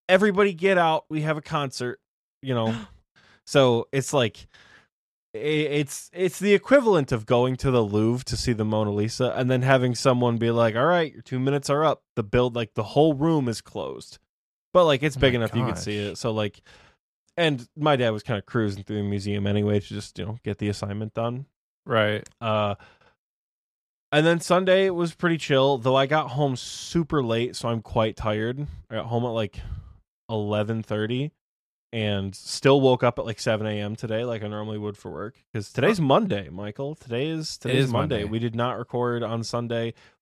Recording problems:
none

